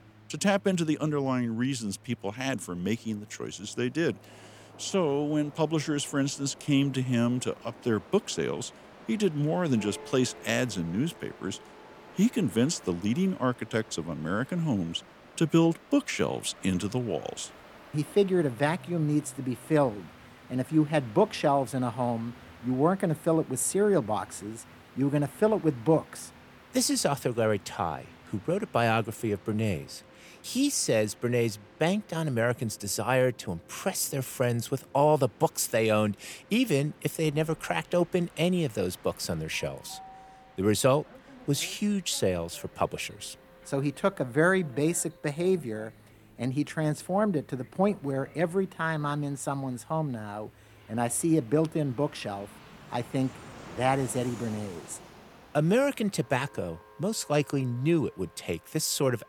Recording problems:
background music; faint; throughout; 30 dB below the speech
train or aircraft noise; faint; throughout; 25 dB below the speech

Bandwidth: 18 kHz